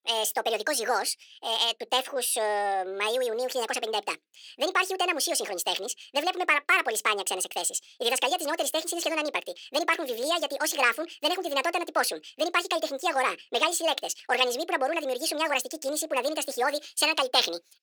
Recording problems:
wrong speed and pitch; too fast and too high; 1.7 times normal speed
thin; somewhat; fading below 450 Hz

